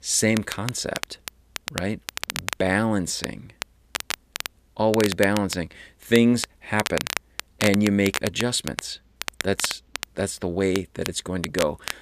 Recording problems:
crackle, like an old record; loud; 8 dB below the speech

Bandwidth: 14.5 kHz